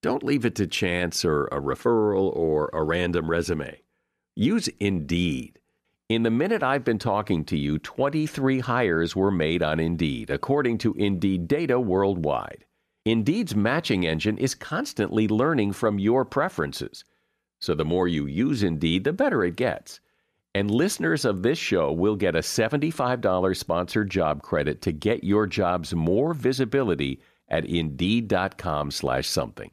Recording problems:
none

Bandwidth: 14.5 kHz